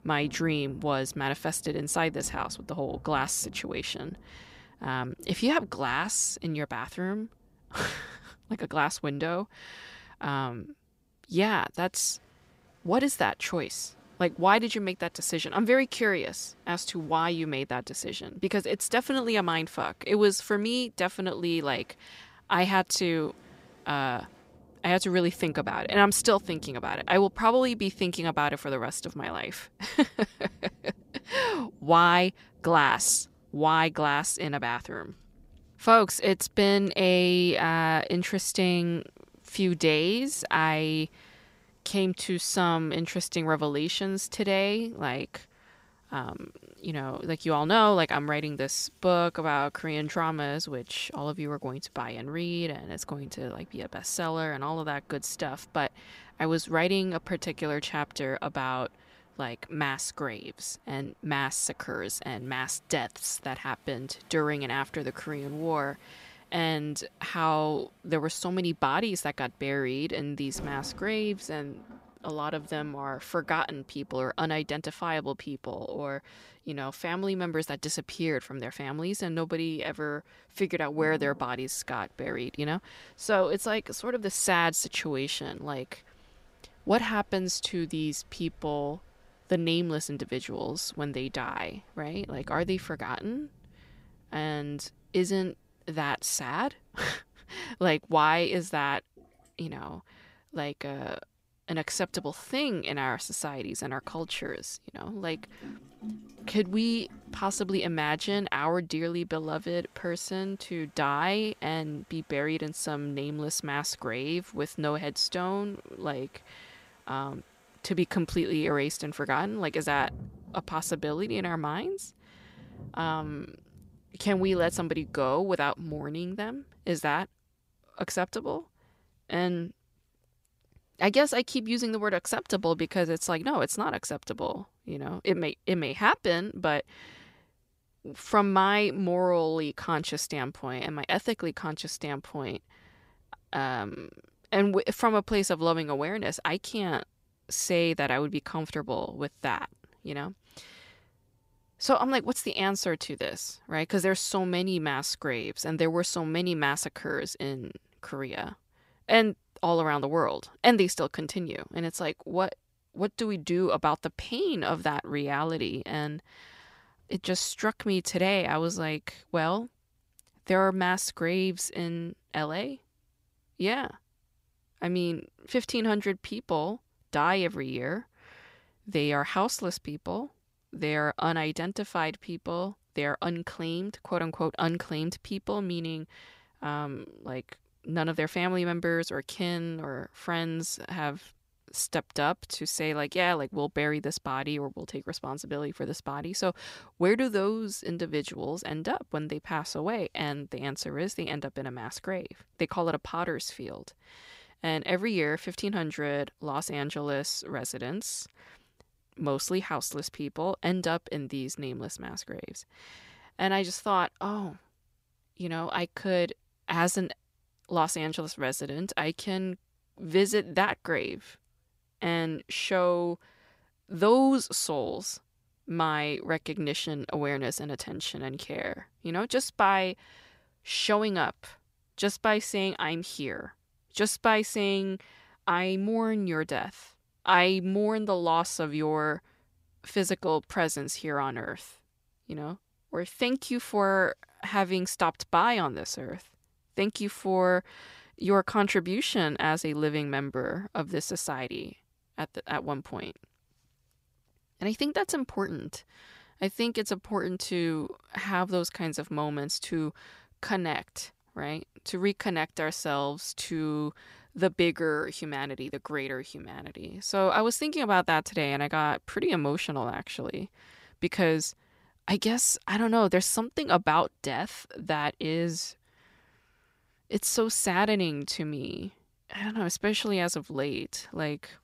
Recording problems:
rain or running water; faint; until 2:13; 25 dB below the speech

